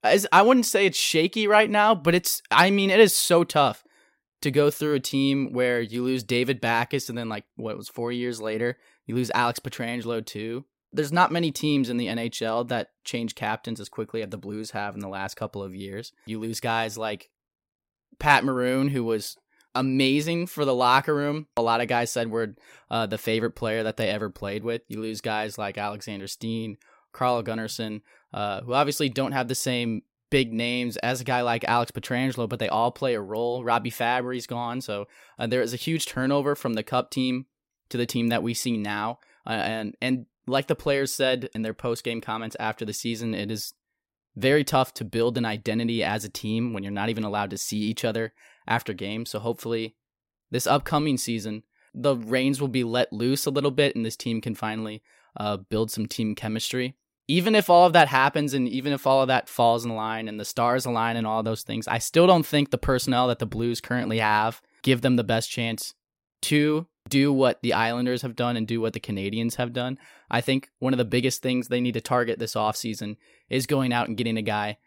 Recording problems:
none

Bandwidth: 16 kHz